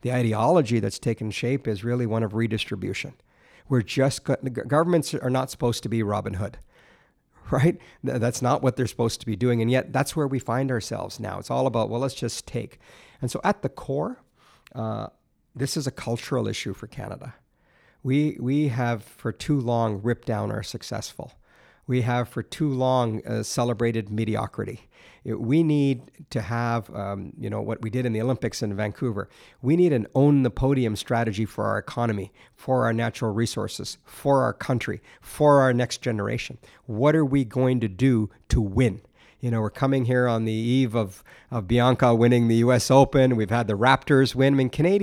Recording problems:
abrupt cut into speech; at the end

